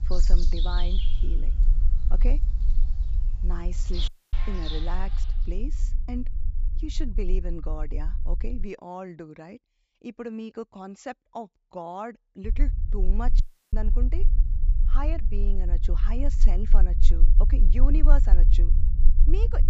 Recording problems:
high frequencies cut off; noticeable; nothing above 8 kHz
animal sounds; loud; until 5 s; 3 dB below the speech
low rumble; noticeable; until 8.5 s and from 12 s on; 10 dB below the speech
audio cutting out; at 4 s and at 13 s

